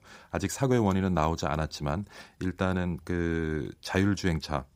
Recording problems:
none

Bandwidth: 15.5 kHz